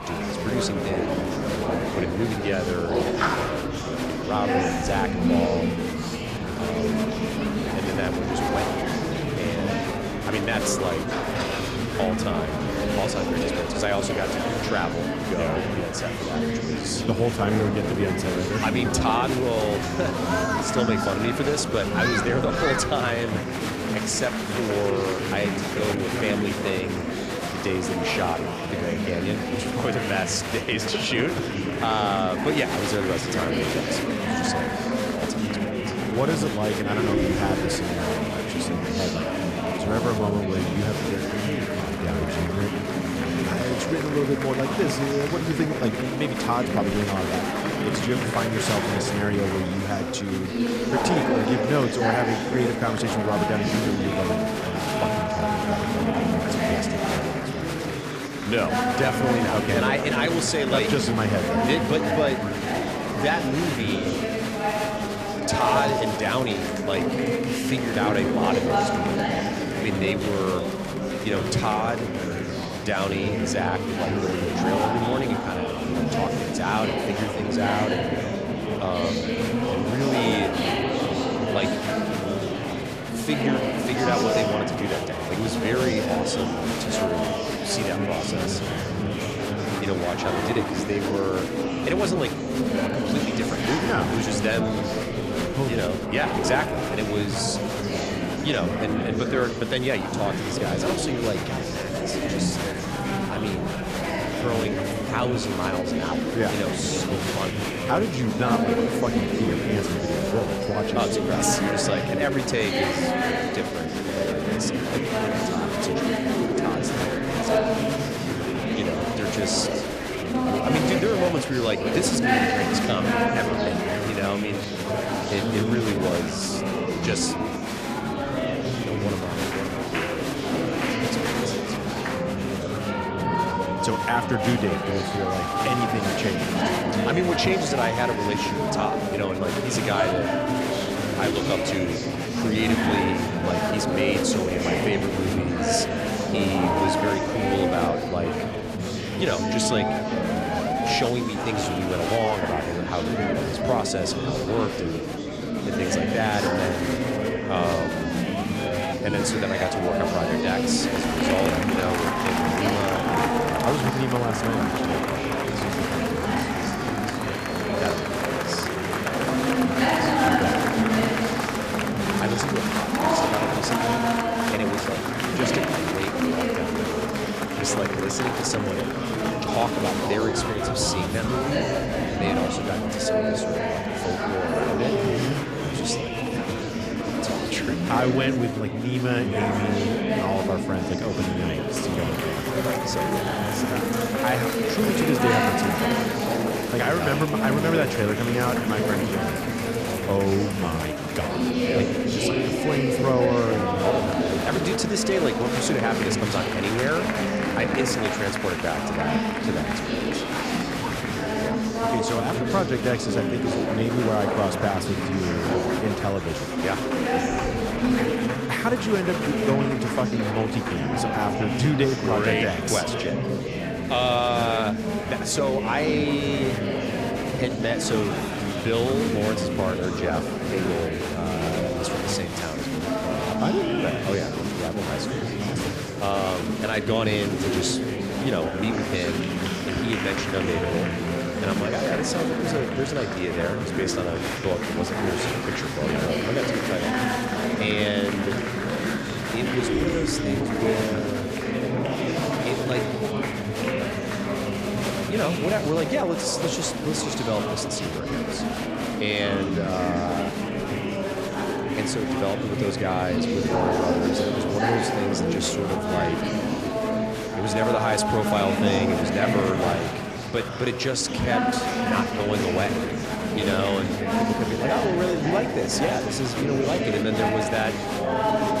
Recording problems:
murmuring crowd; very loud; throughout; 2 dB above the speech

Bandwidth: 14.5 kHz